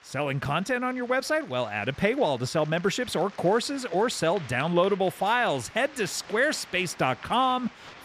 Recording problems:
crowd noise; noticeable; throughout; 20 dB below the speech

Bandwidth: 14.5 kHz